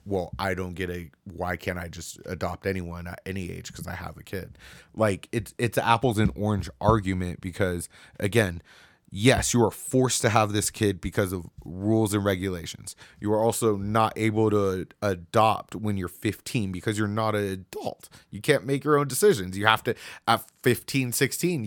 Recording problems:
abrupt cut into speech; at the end

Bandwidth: 18 kHz